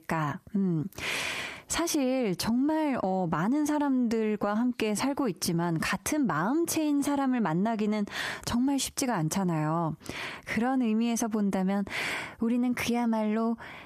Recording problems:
squashed, flat; heavily

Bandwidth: 14.5 kHz